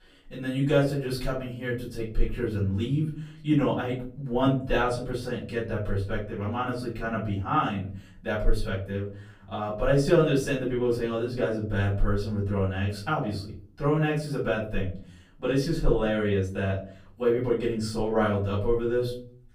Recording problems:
off-mic speech; far
room echo; slight; dies away in 0.5 s

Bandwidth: 15.5 kHz